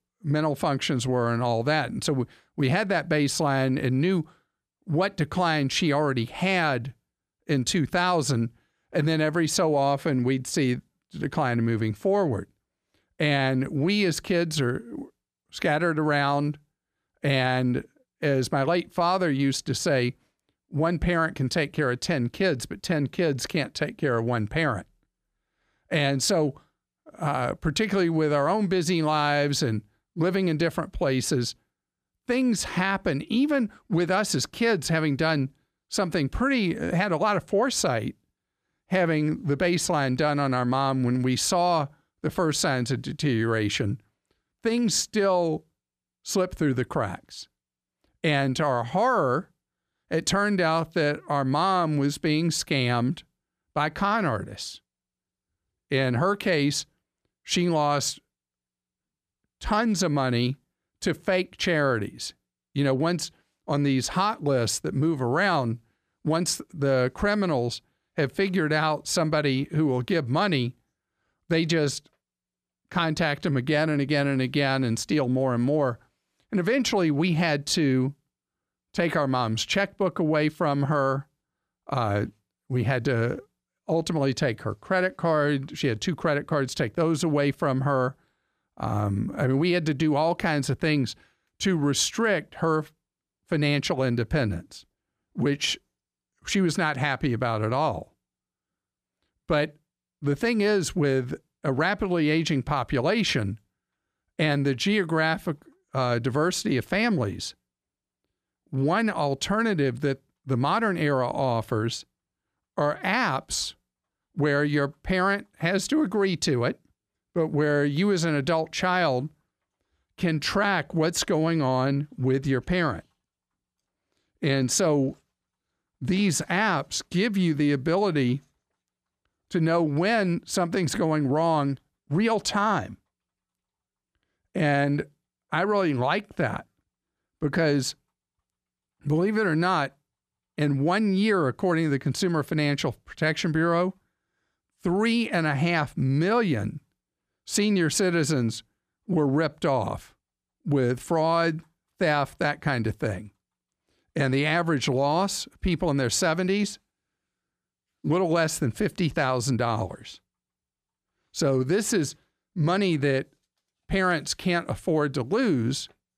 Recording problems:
none

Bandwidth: 14.5 kHz